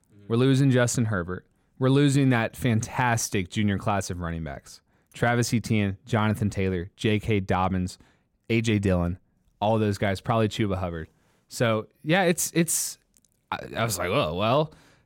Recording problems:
none

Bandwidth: 16.5 kHz